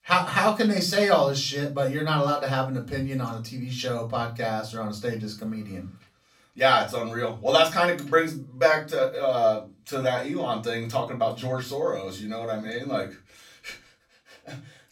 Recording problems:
off-mic speech; far
room echo; very slight; dies away in 0.3 s

